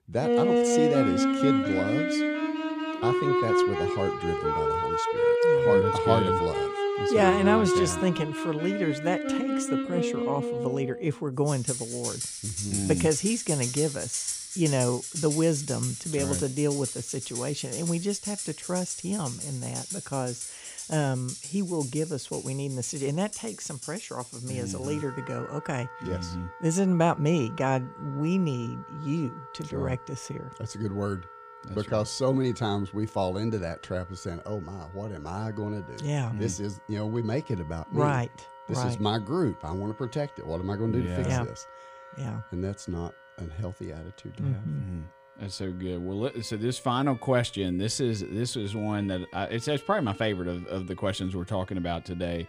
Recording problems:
background music; very loud; throughout; 1 dB above the speech

